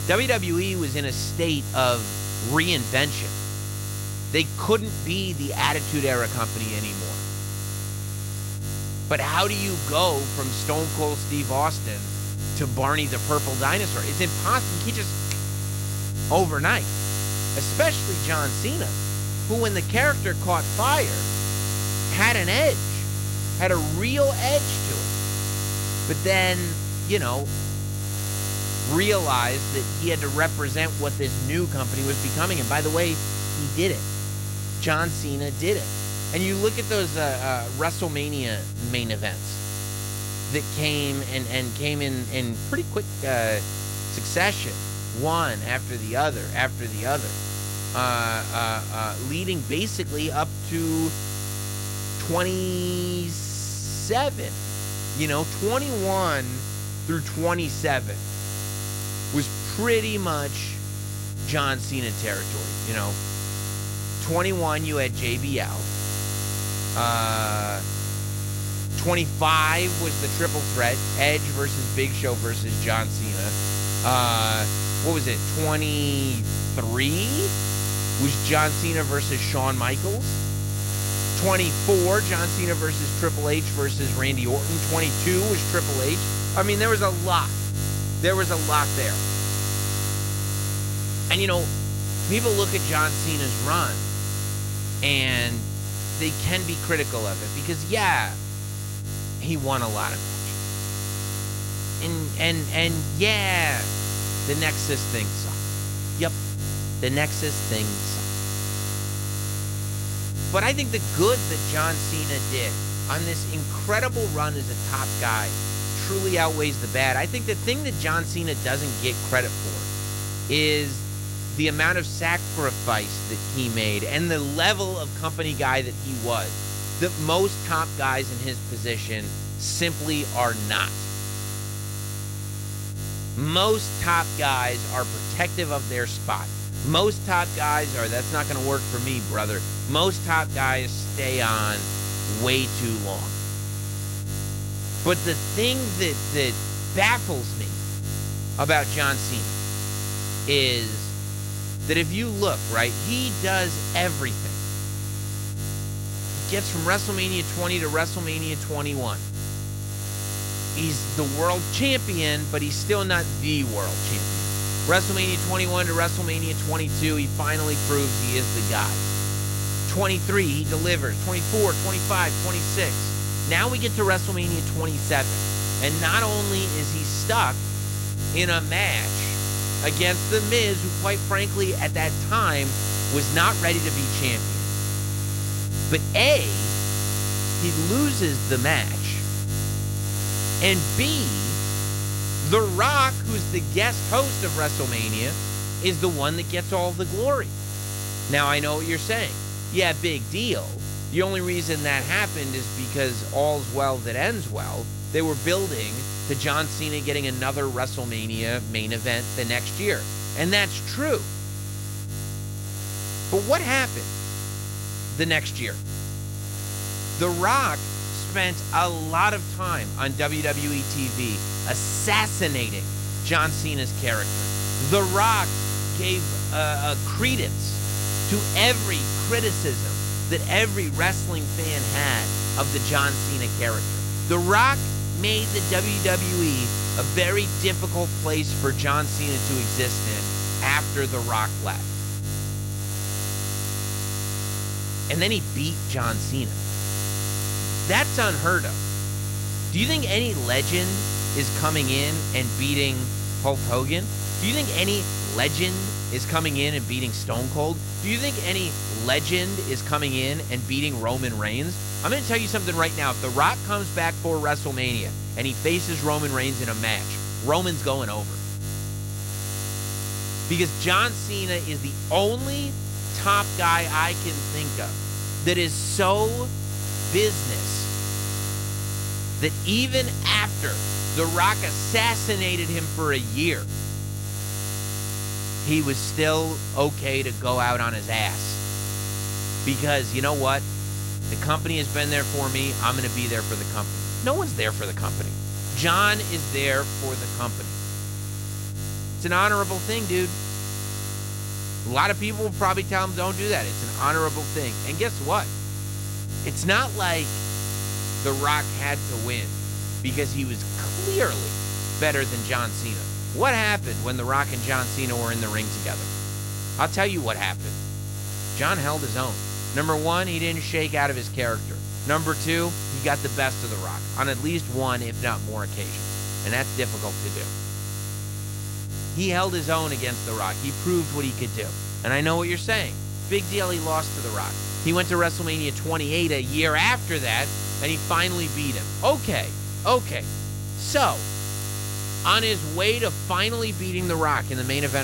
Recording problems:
electrical hum; loud; throughout; 50 Hz, 8 dB below the speech
abrupt cut into speech; at the end

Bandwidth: 16 kHz